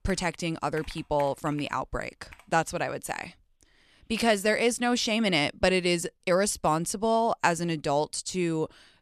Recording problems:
household noises; faint; until 2.5 s; 20 dB below the speech

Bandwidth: 13.5 kHz